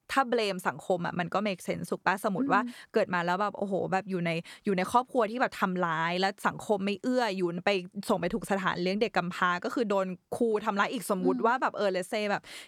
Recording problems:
none

